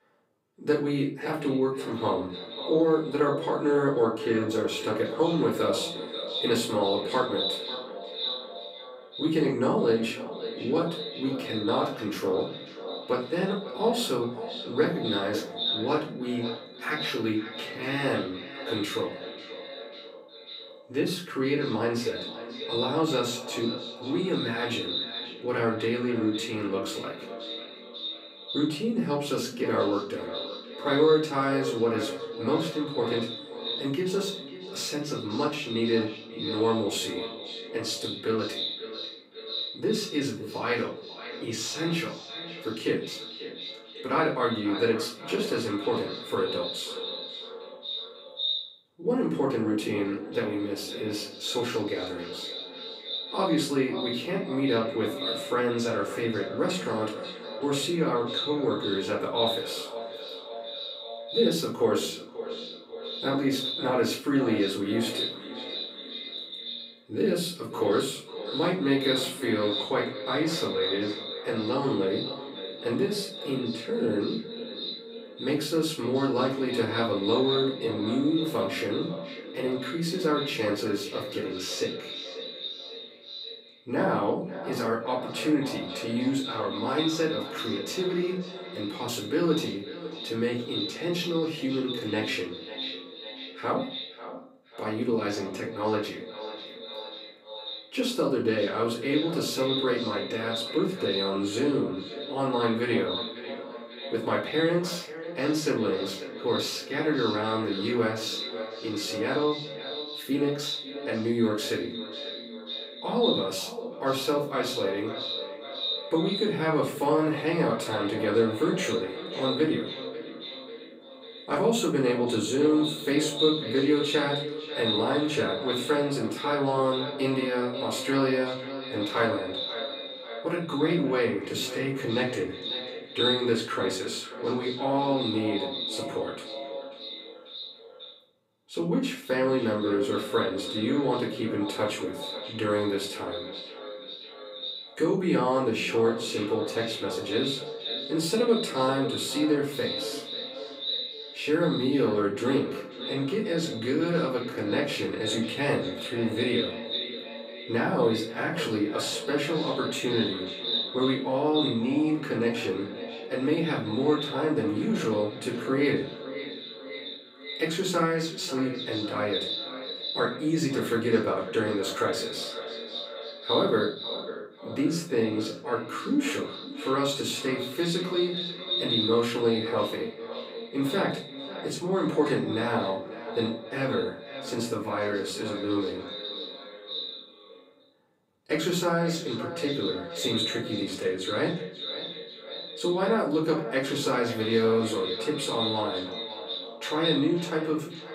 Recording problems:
echo of what is said; strong; throughout; 540 ms later, 7 dB below the speech
off-mic speech; far
room echo; slight; dies away in 0.3 s

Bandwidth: 15.5 kHz